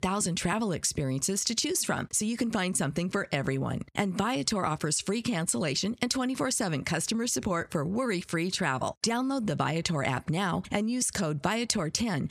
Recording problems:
squashed, flat; somewhat

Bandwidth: 14 kHz